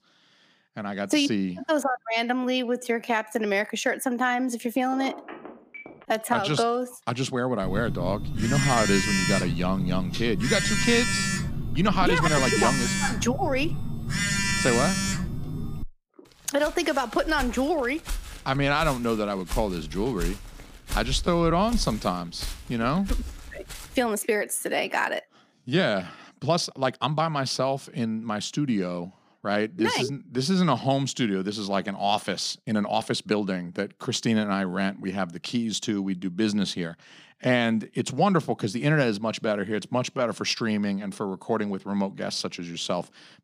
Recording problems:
uneven, jittery; strongly; from 2.5 to 40 s
phone ringing; faint; from 5 to 6 s; peak 10 dB below the speech
phone ringing; loud; from 7.5 to 16 s; peak 3 dB above the speech
footsteps; noticeable; from 17 to 24 s; peak 7 dB below the speech

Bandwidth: 15 kHz